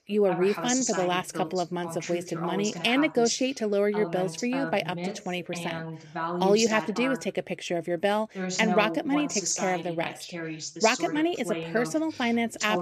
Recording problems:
voice in the background; loud; throughout; 6 dB below the speech

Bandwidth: 14.5 kHz